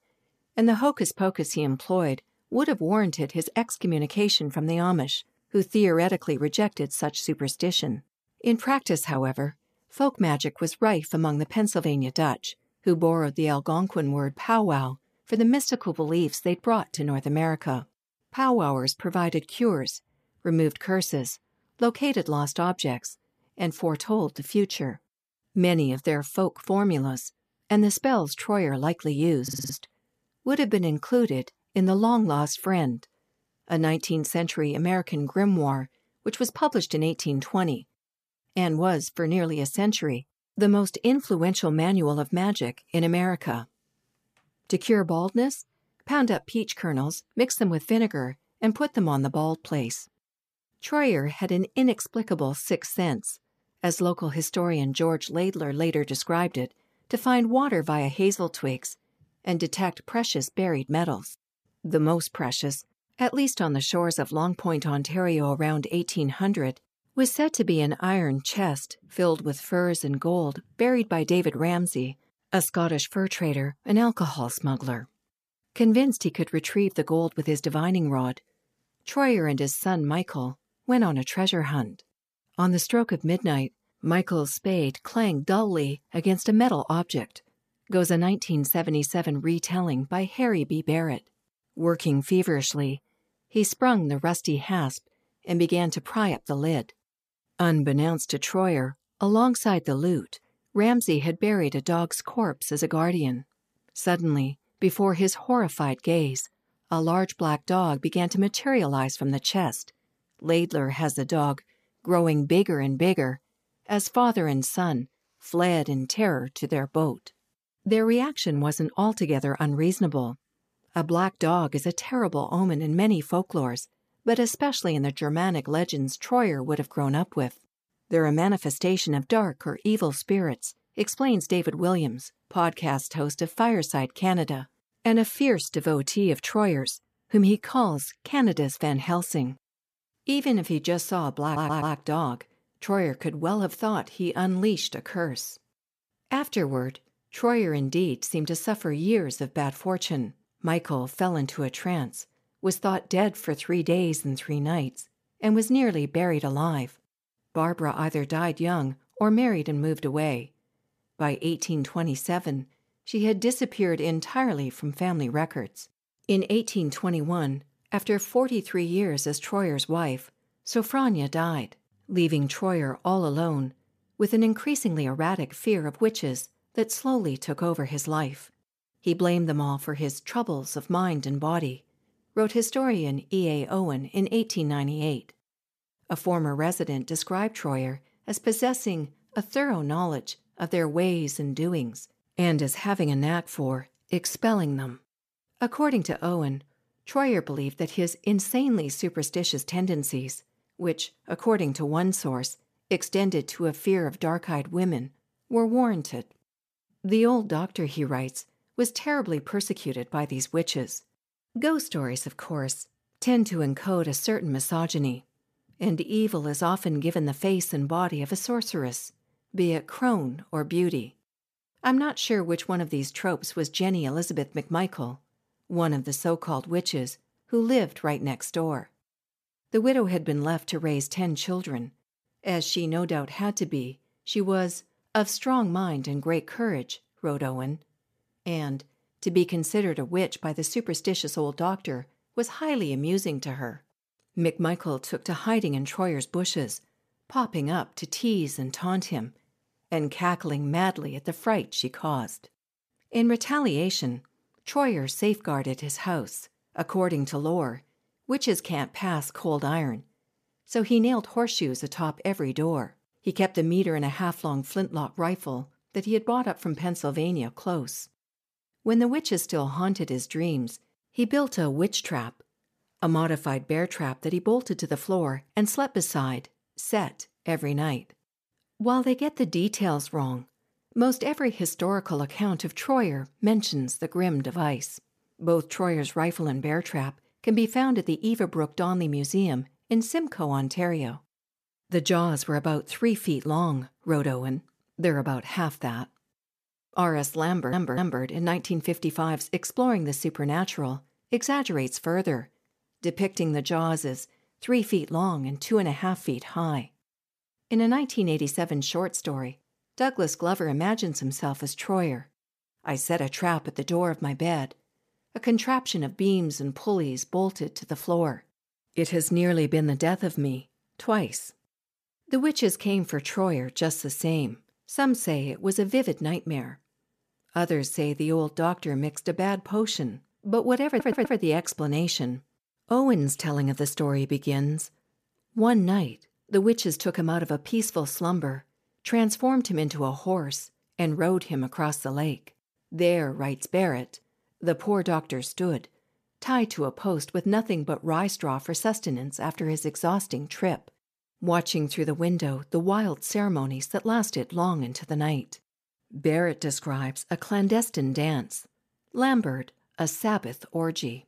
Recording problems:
audio stuttering; 4 times, first at 29 s

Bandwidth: 14.5 kHz